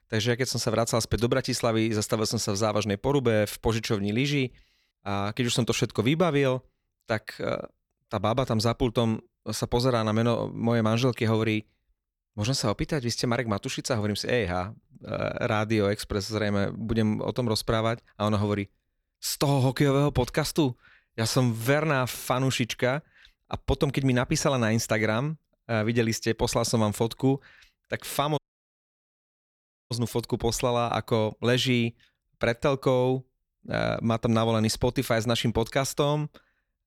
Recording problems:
audio cutting out; at 28 s for 1.5 s

